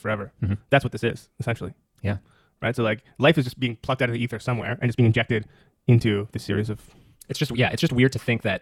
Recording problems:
wrong speed, natural pitch; too fast; 1.6 times normal speed

